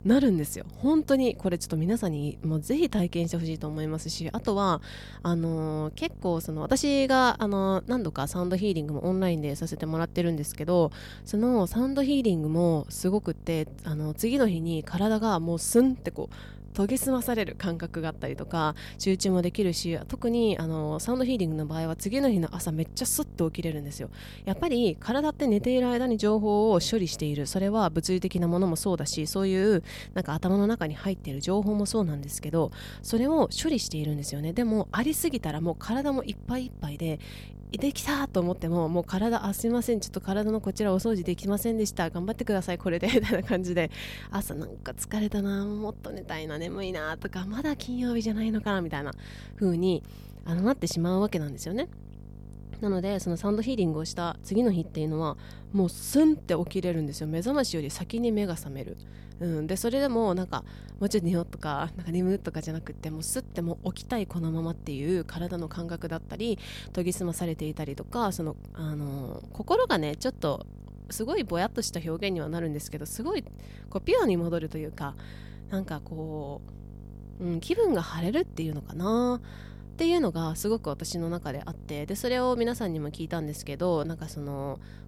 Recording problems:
electrical hum; faint; throughout; 50 Hz, 25 dB below the speech

